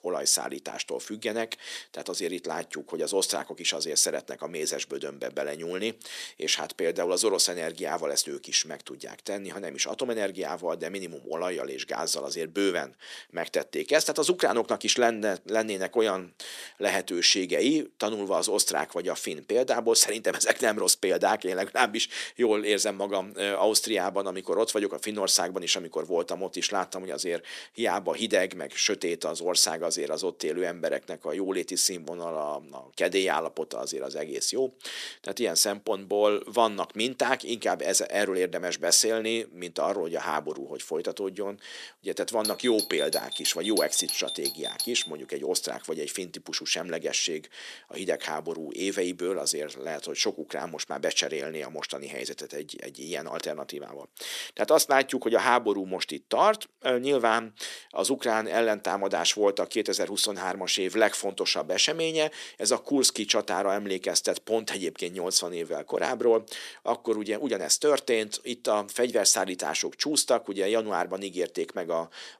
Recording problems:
thin; somewhat; fading below 350 Hz
doorbell; noticeable; from 42 to 45 s; peak 2 dB below the speech

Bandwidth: 14 kHz